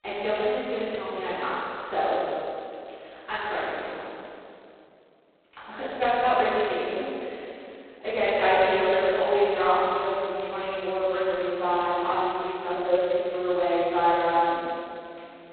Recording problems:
phone-call audio; poor line; nothing above 4 kHz
room echo; strong; dies away in 2.7 s
off-mic speech; far

